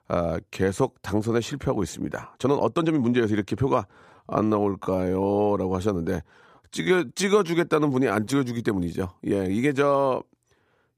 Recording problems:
uneven, jittery; strongly; from 2.5 to 10 s

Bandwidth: 15 kHz